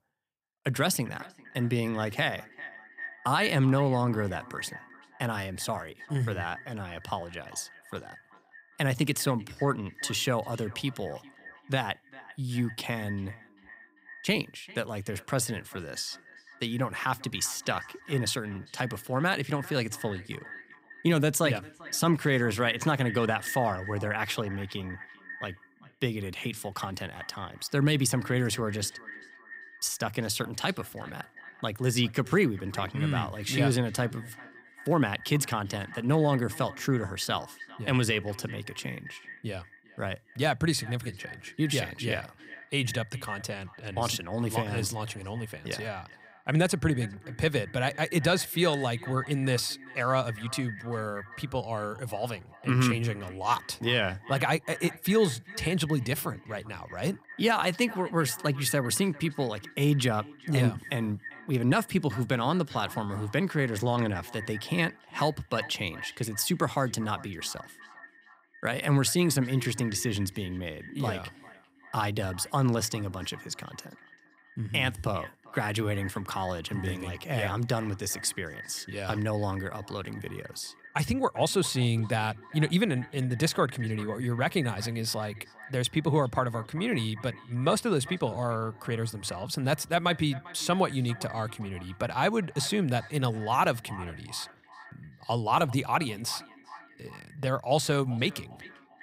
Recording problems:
echo of what is said; noticeable; throughout; 400 ms later, 15 dB below the speech

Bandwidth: 15.5 kHz